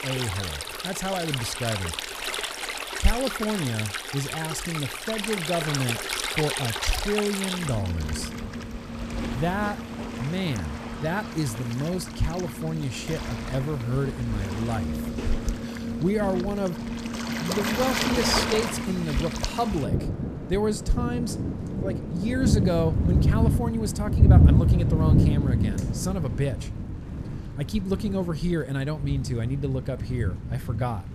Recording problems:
rain or running water; very loud; throughout; 1 dB above the speech

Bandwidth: 14.5 kHz